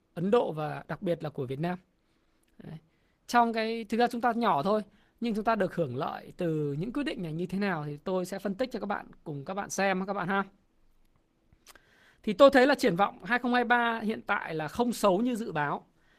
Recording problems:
garbled, watery; slightly; nothing above 14.5 kHz

